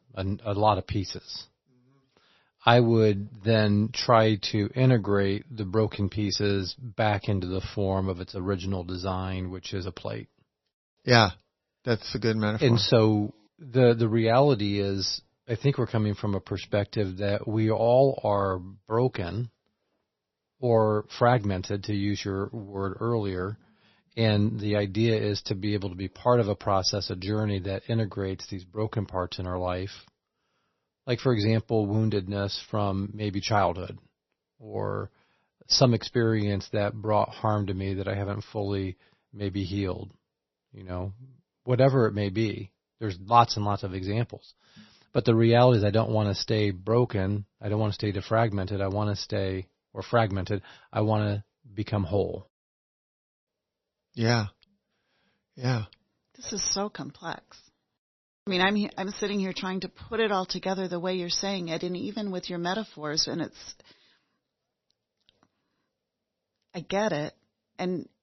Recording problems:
garbled, watery; slightly; nothing above 6 kHz

